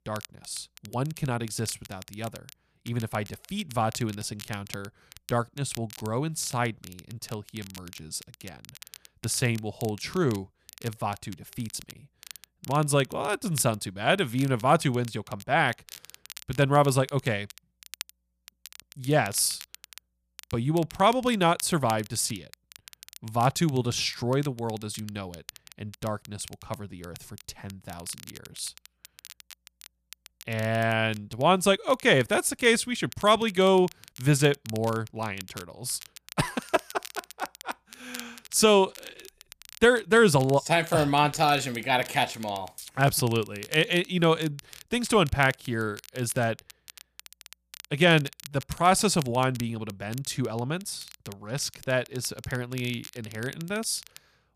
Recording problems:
crackle, like an old record; faint; 20 dB below the speech

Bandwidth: 14.5 kHz